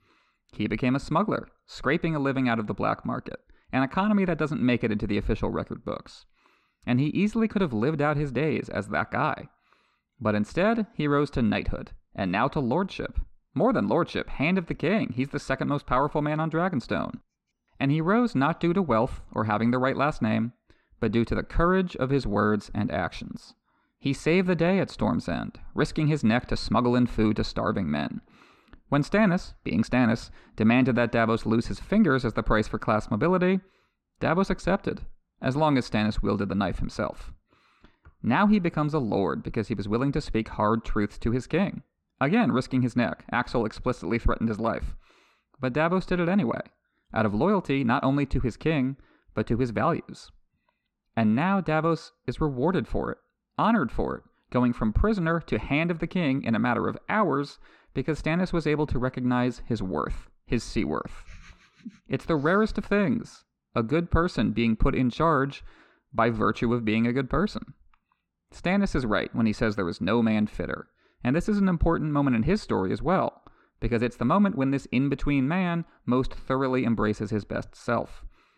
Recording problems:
muffled; very slightly; fading above 3.5 kHz

